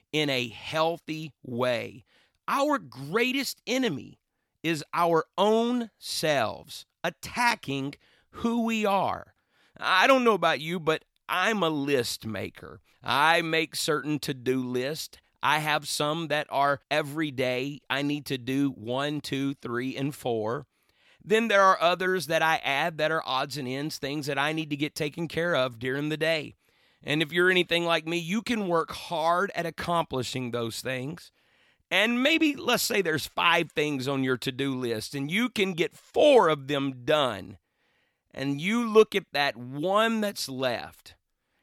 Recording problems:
none

